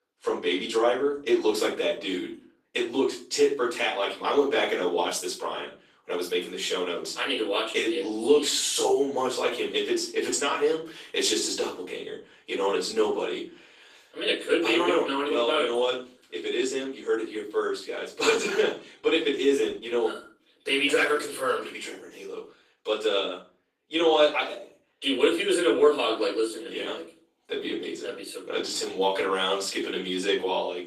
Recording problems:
off-mic speech; far
thin; somewhat; fading below 350 Hz
room echo; slight; dies away in 0.4 s
garbled, watery; slightly; nothing above 14.5 kHz

